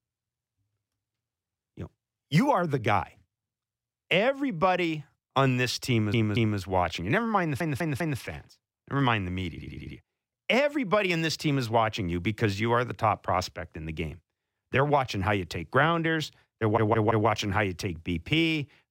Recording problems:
audio stuttering; 4 times, first at 6 s

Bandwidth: 16 kHz